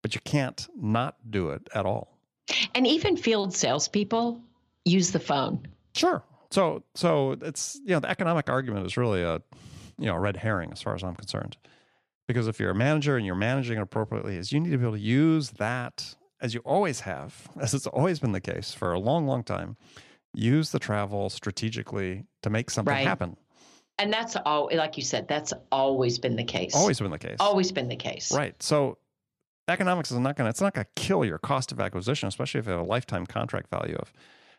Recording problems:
none

